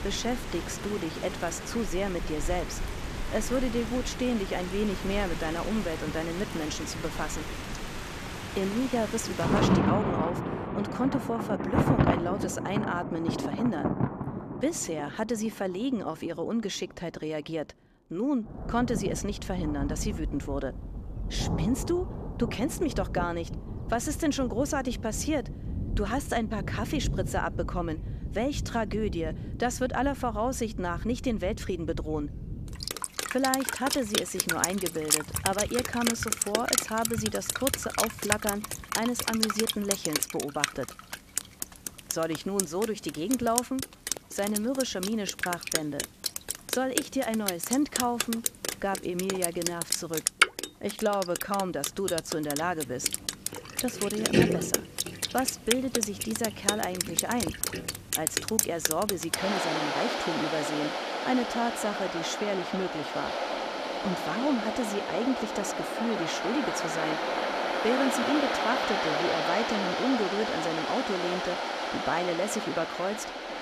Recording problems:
rain or running water; loud; throughout; as loud as the speech

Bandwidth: 14.5 kHz